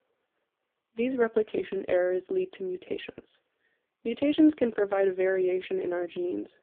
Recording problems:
phone-call audio; poor line

